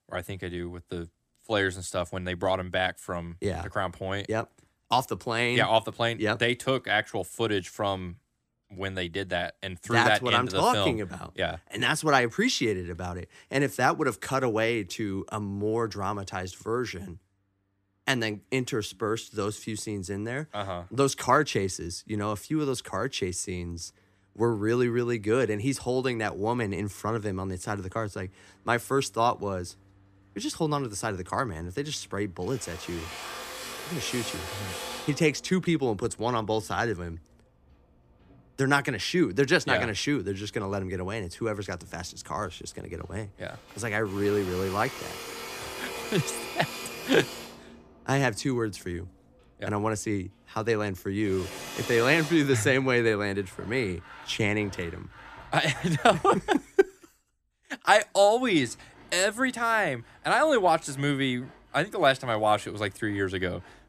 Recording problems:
machinery noise; noticeable; throughout; 10 dB below the speech

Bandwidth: 14.5 kHz